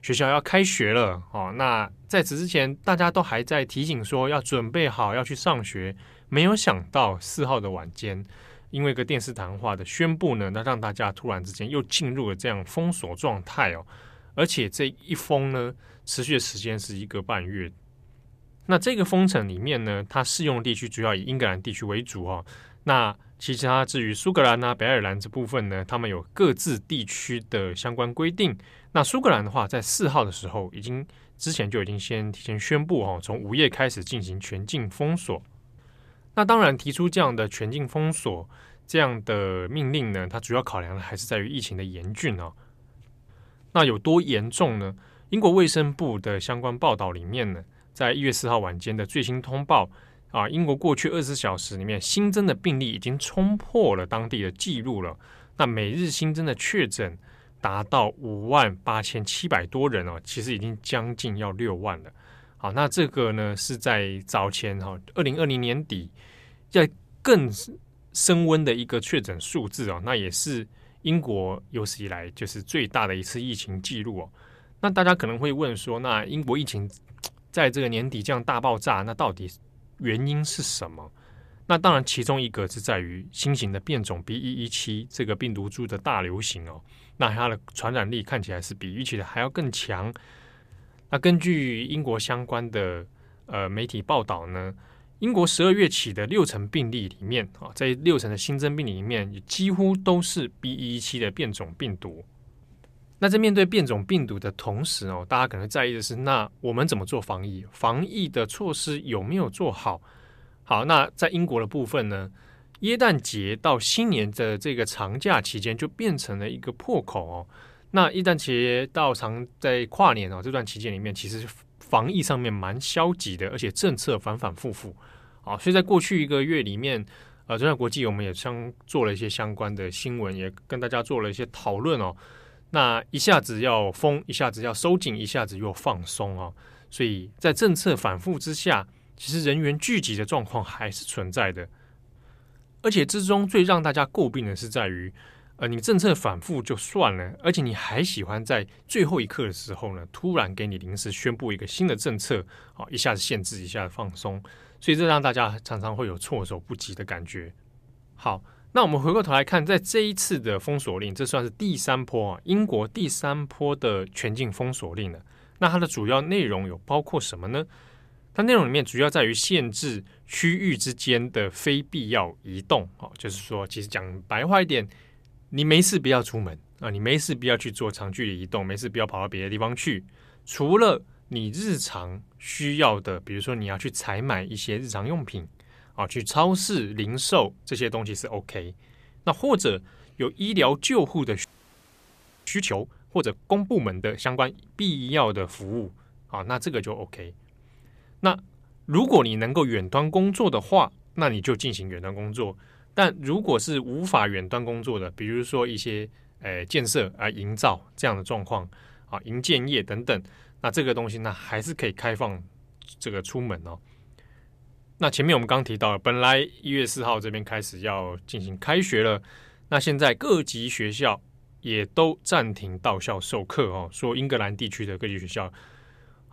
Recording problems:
audio freezing; at 3:11 for 1 s

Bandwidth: 14.5 kHz